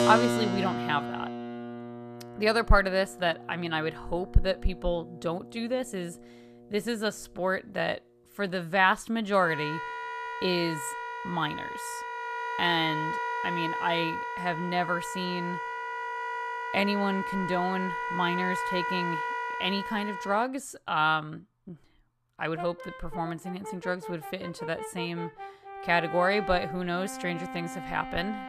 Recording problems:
background music; loud; throughout; 5 dB below the speech

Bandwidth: 14.5 kHz